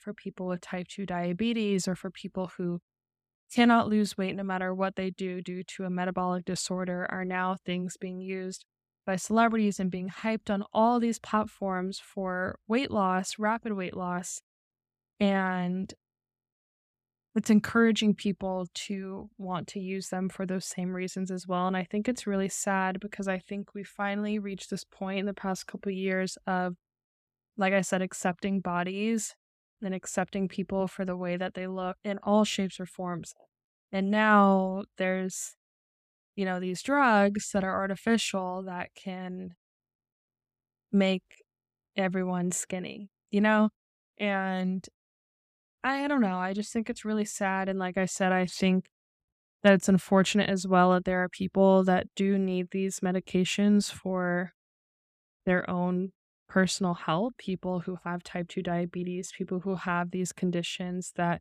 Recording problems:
none

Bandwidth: 14.5 kHz